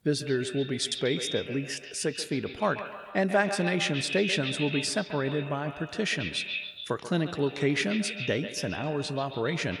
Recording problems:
echo of what is said; strong; throughout; 140 ms later, 7 dB below the speech

